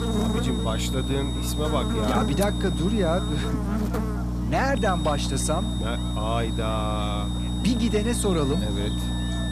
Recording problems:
electrical hum; loud; throughout; 60 Hz, 6 dB below the speech
high-pitched whine; loud; until 3.5 s and from 5 s on; 3.5 kHz, 9 dB below the speech
background music; faint; throughout; 20 dB below the speech
background chatter; faint; throughout; 4 voices, 25 dB below the speech

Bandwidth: 14.5 kHz